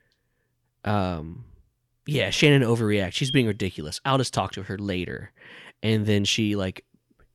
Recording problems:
none

